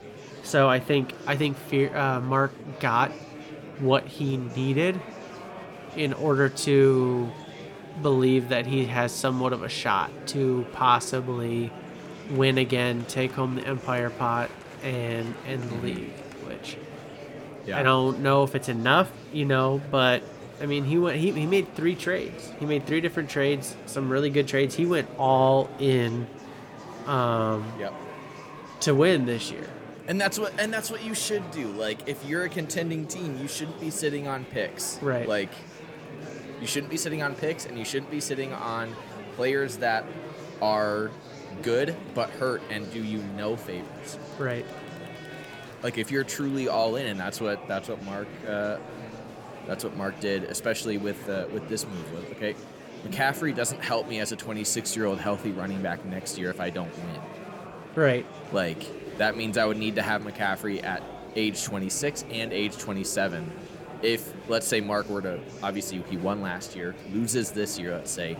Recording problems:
murmuring crowd; noticeable; throughout; 15 dB below the speech

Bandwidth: 17 kHz